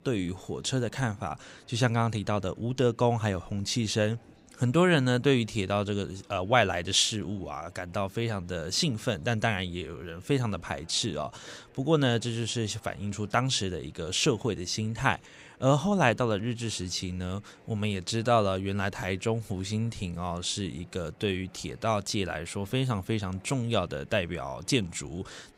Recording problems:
chatter from many people; faint; throughout; 30 dB below the speech

